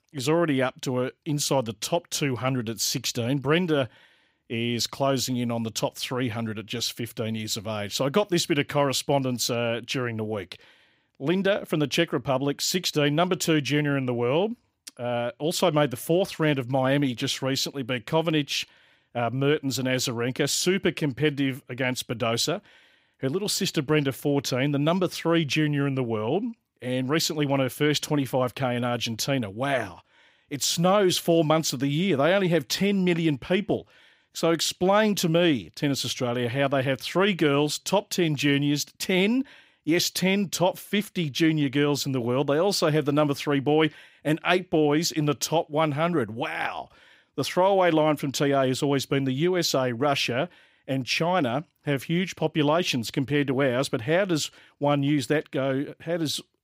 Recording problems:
none

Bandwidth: 15.5 kHz